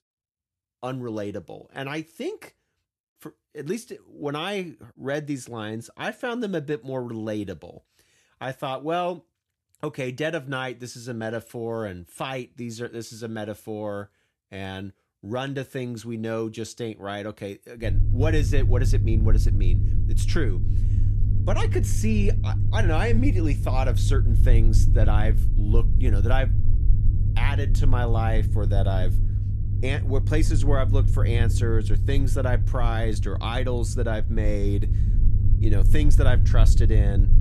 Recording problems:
low rumble; loud; from 18 s on; 8 dB below the speech

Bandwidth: 13.5 kHz